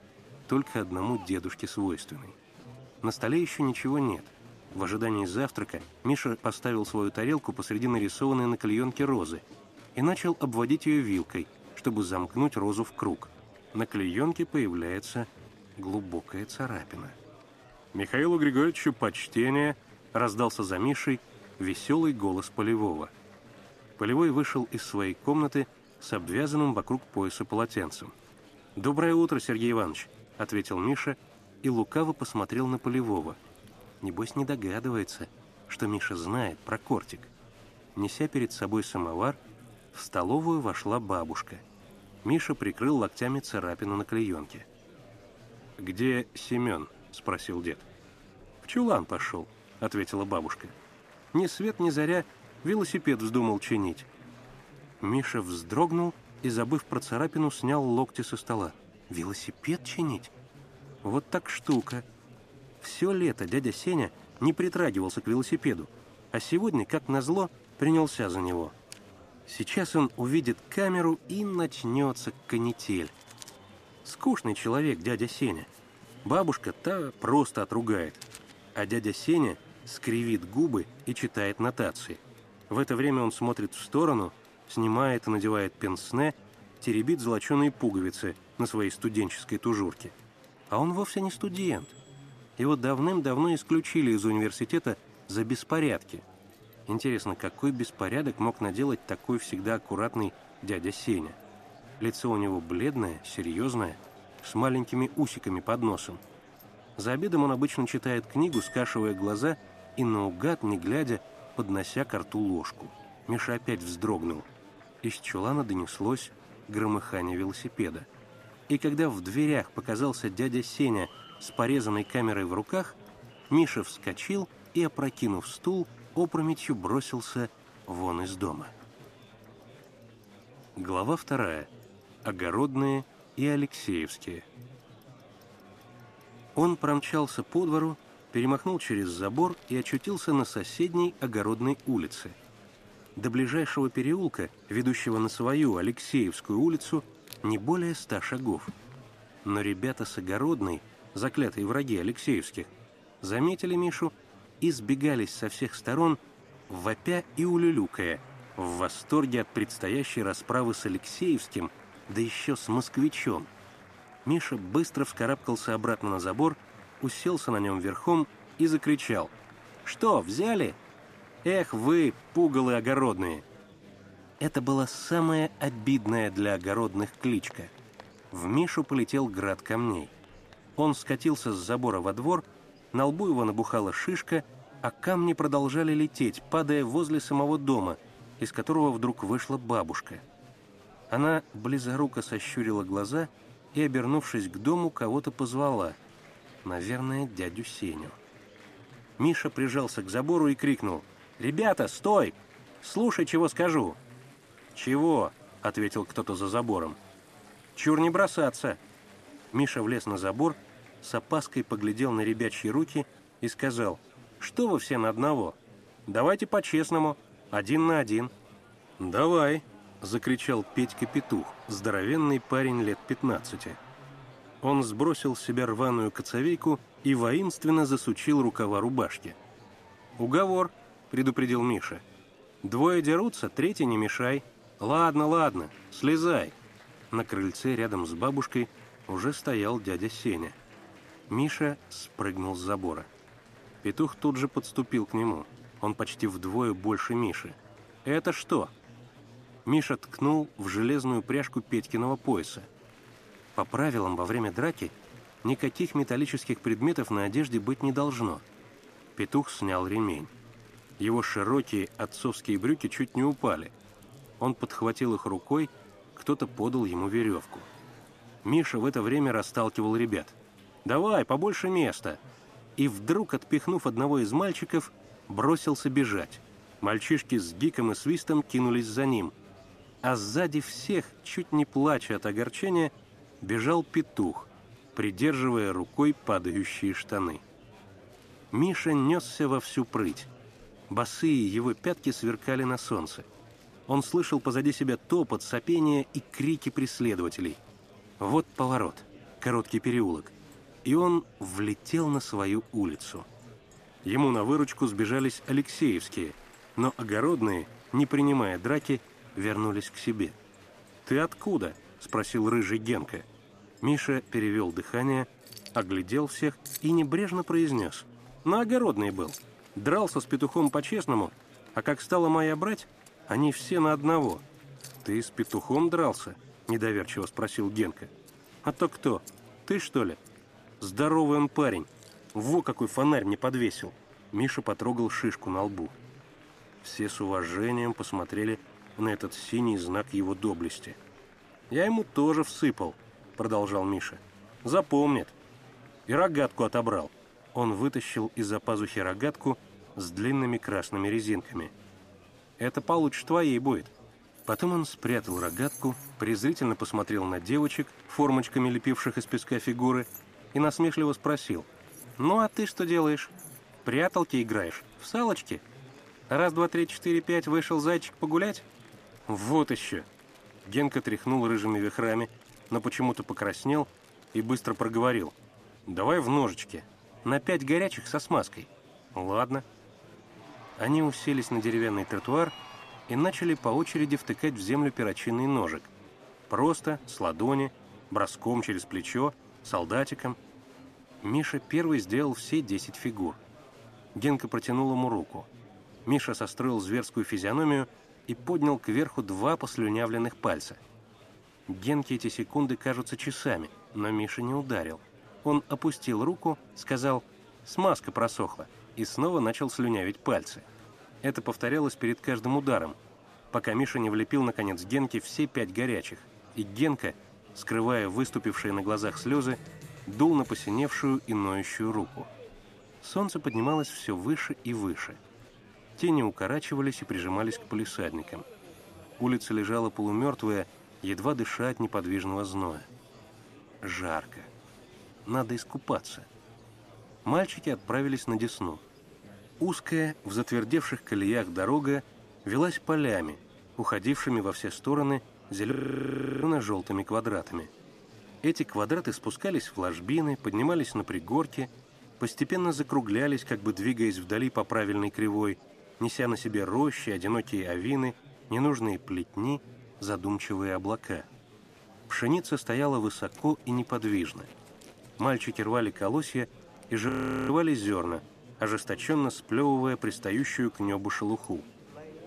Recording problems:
household noises; faint; throughout; 25 dB below the speech
murmuring crowd; faint; throughout; 25 dB below the speech
audio freezing; at 7:26 for 0.5 s and at 7:47

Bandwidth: 14.5 kHz